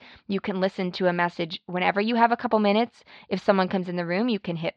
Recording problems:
muffled; very slightly; fading above 4.5 kHz

